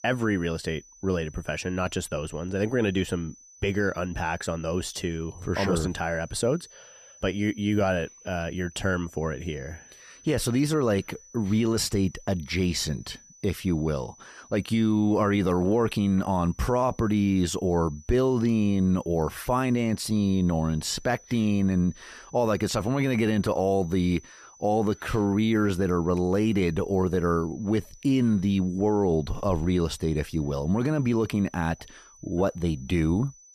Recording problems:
high-pitched whine; faint; throughout; 6 kHz, 25 dB below the speech

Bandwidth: 14.5 kHz